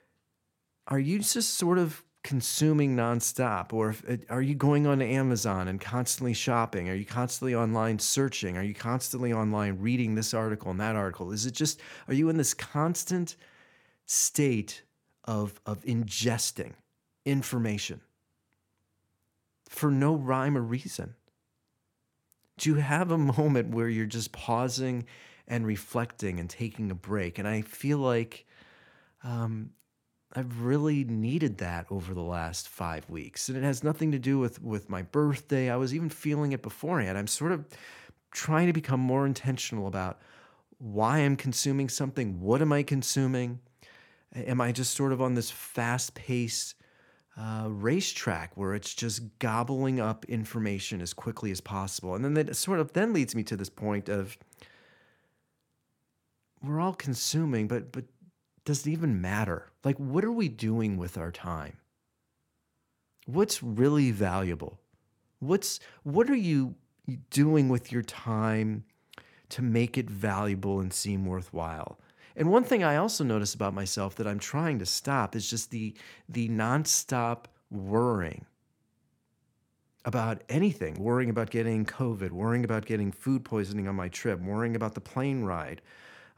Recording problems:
none

